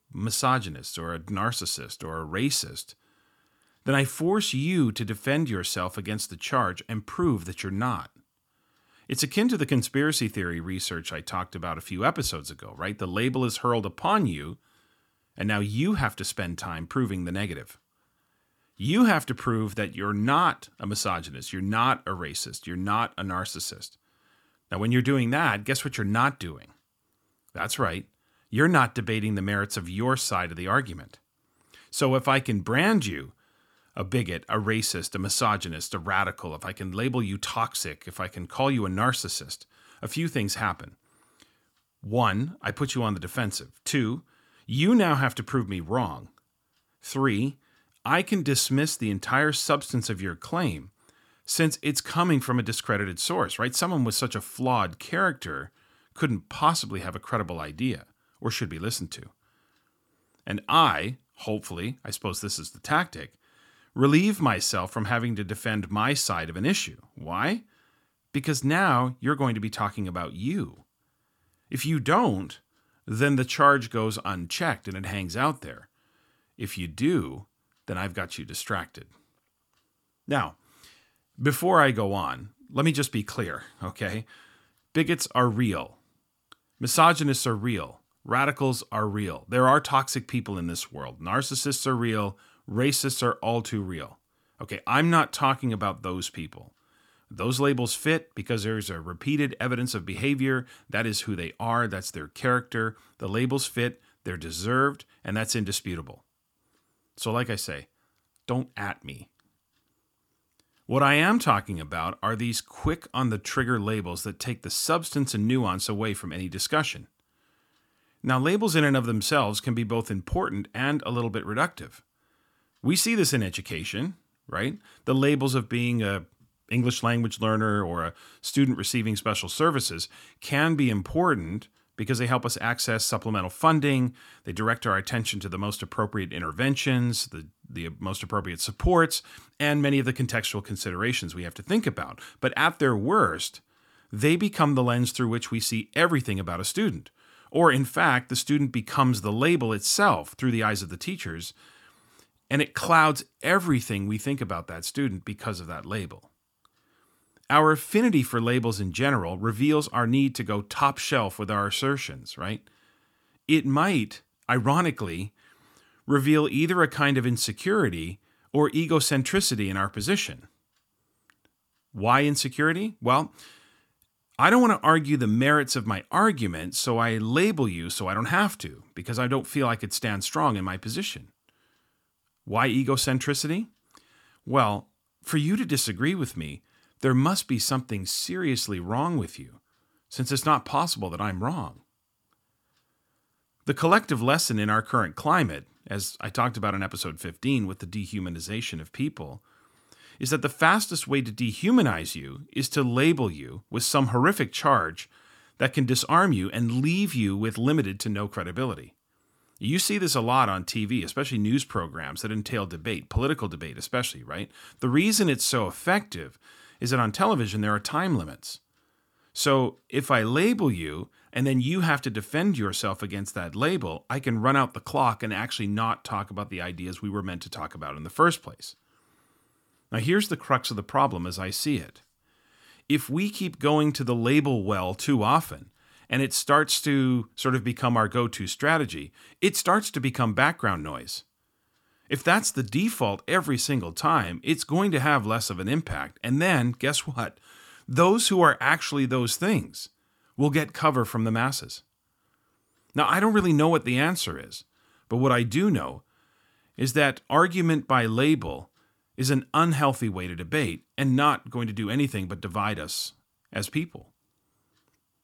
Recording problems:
none

